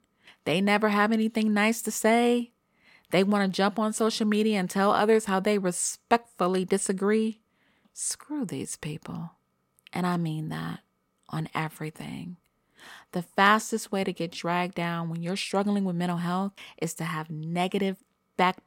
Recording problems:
none

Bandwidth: 16.5 kHz